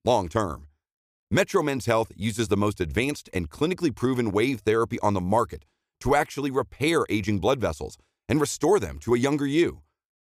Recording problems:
none

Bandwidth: 15 kHz